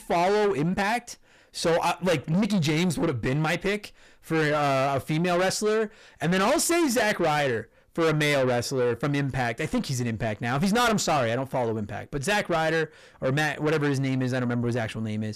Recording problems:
distortion; heavy; 6 dB below the speech

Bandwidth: 14.5 kHz